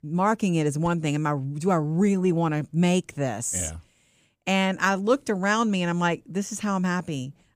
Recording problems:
none

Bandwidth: 15 kHz